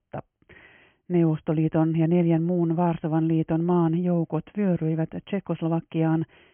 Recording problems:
high frequencies cut off; severe; nothing above 3 kHz

